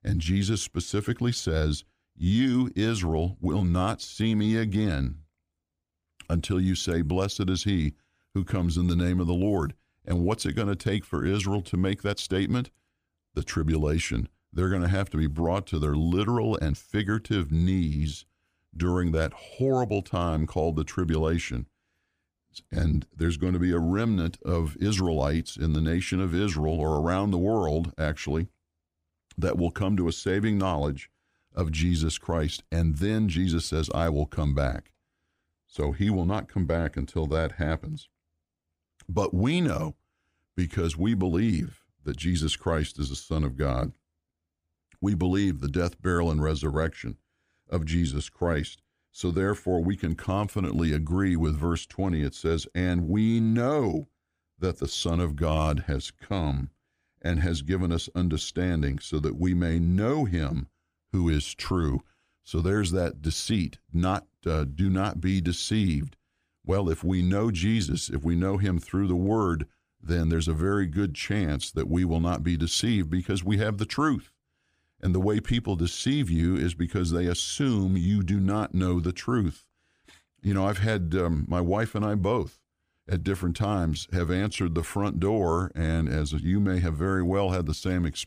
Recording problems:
uneven, jittery; slightly; from 2 s to 1:25

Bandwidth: 15 kHz